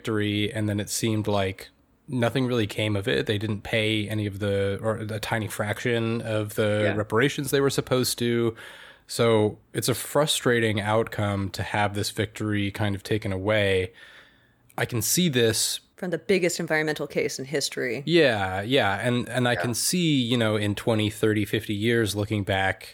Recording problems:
none

